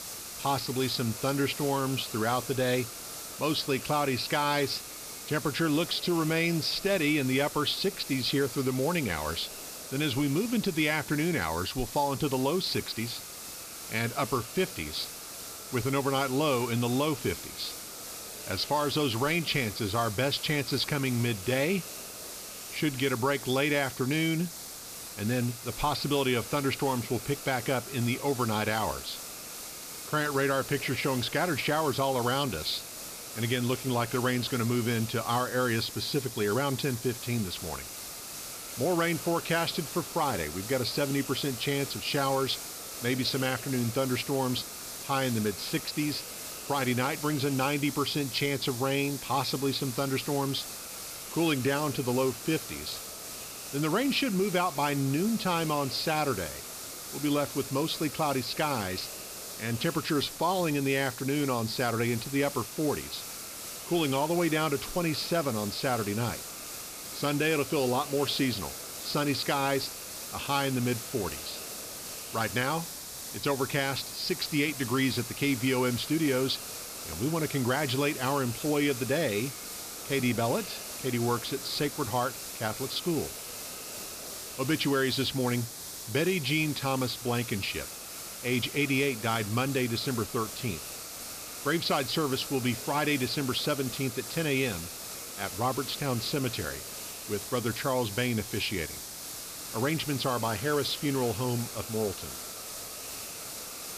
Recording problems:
high frequencies cut off; noticeable; nothing above 5.5 kHz
hiss; loud; throughout; 8 dB below the speech

